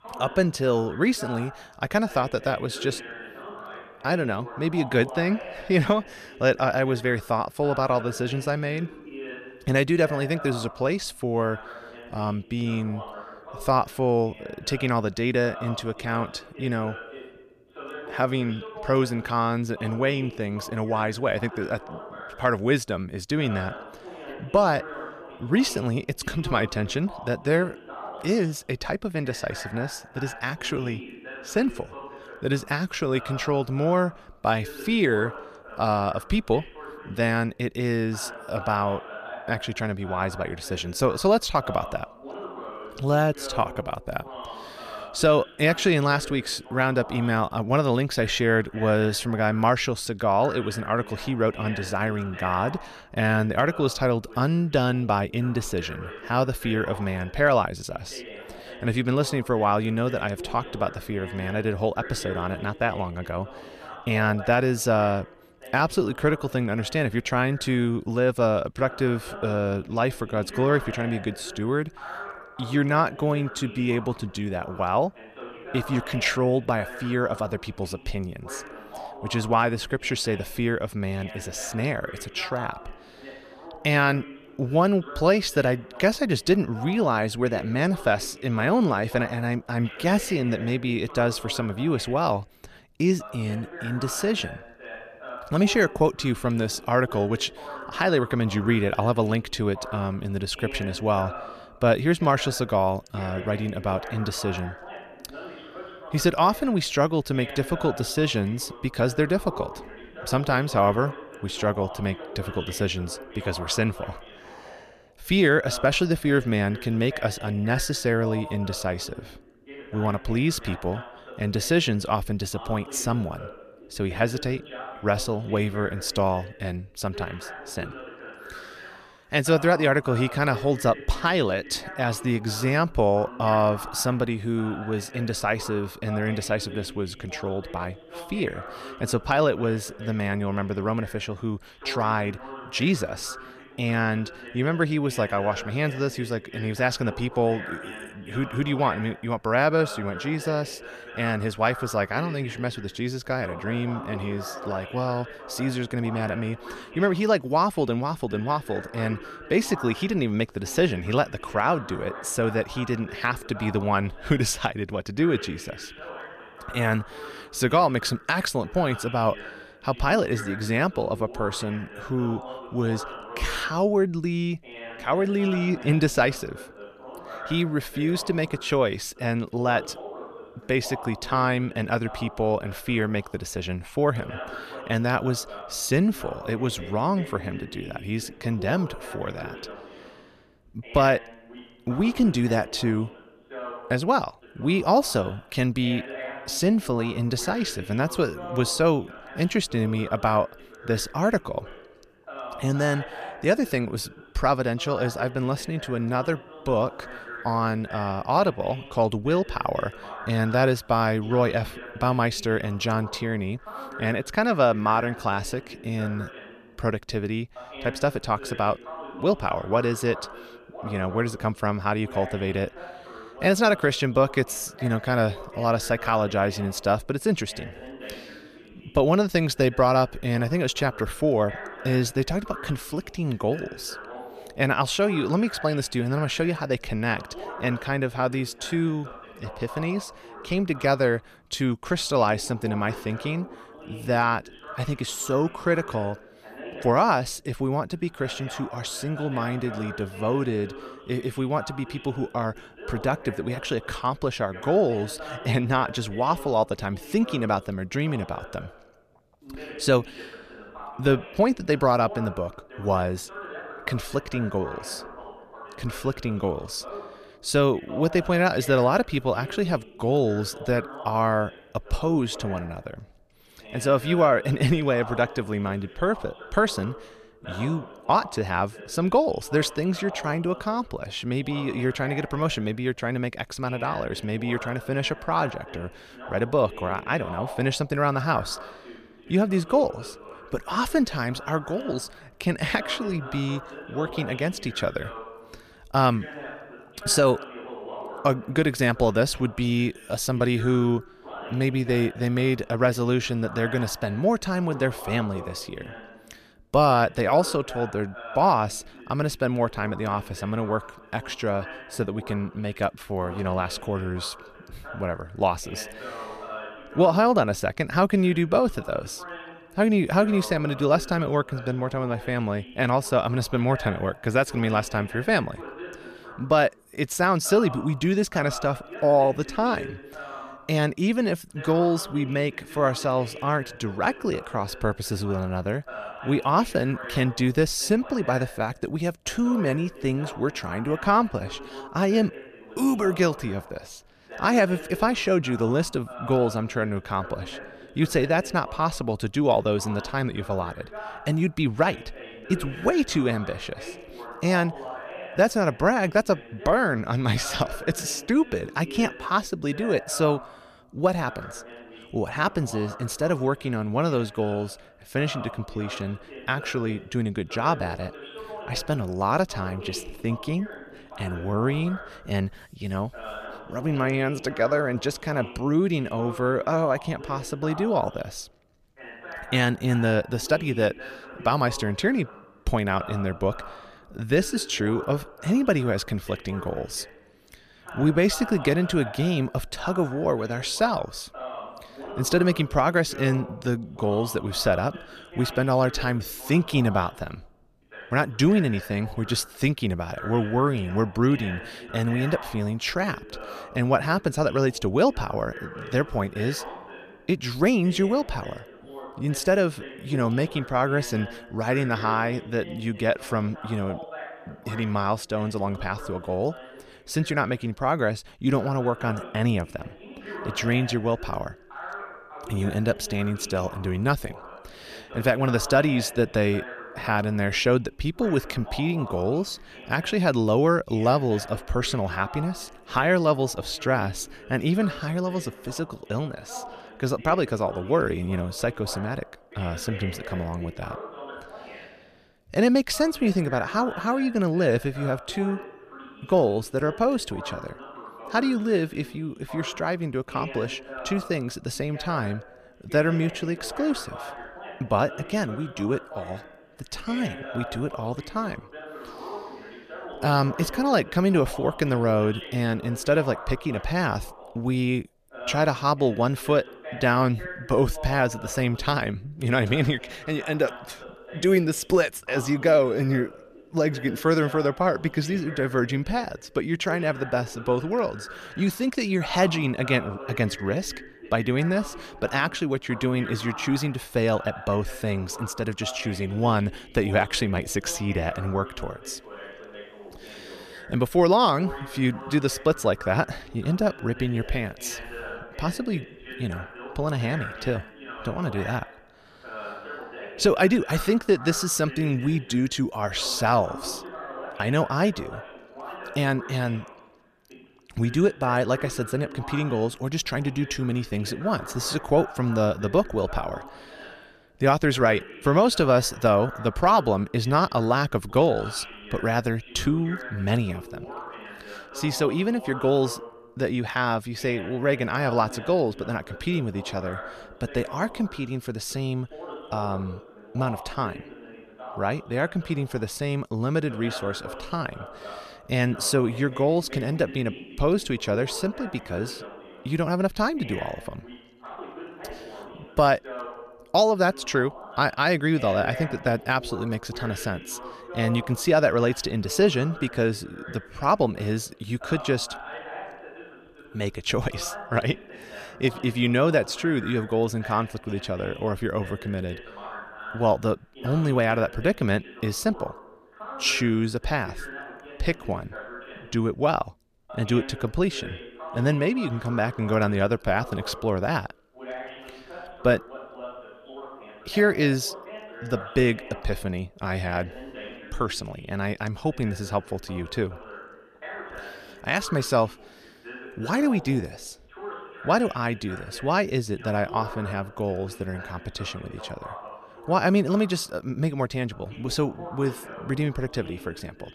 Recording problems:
voice in the background; noticeable; throughout; 15 dB below the speech

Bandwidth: 14.5 kHz